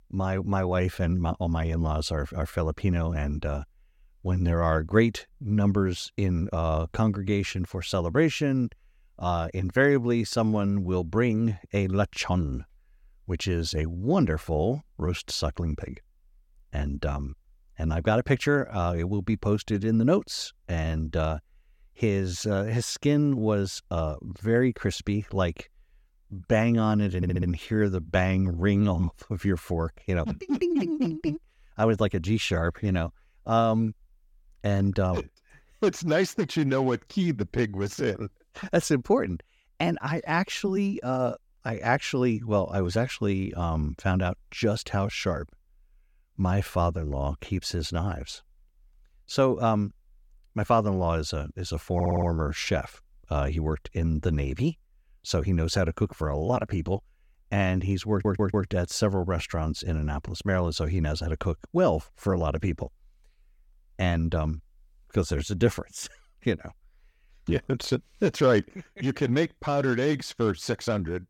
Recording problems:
audio stuttering; at 27 s, at 52 s and at 58 s

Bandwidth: 17 kHz